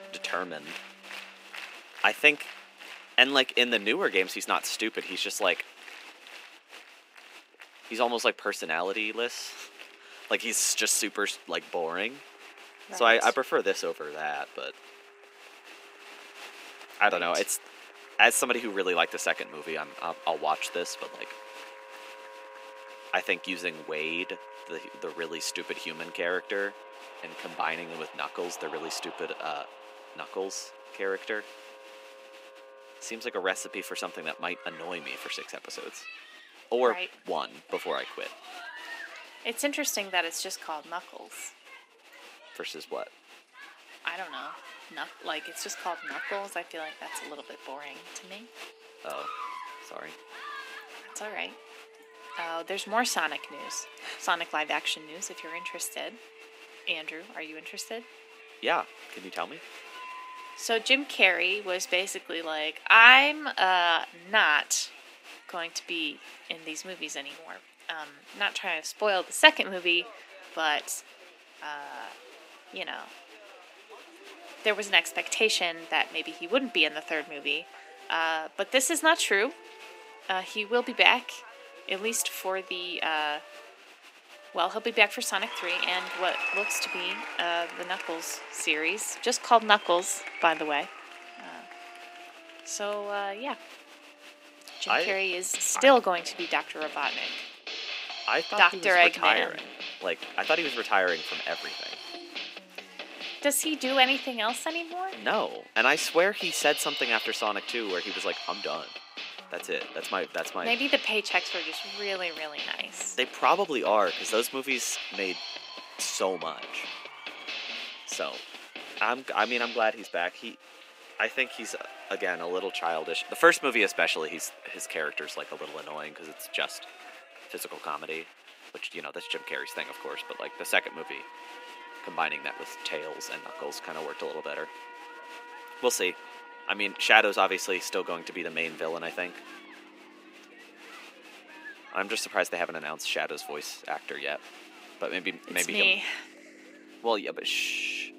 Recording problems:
thin; somewhat; fading below 250 Hz
crowd noise; noticeable; throughout; 15 dB below the speech
background music; noticeable; throughout; 15 dB below the speech

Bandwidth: 15.5 kHz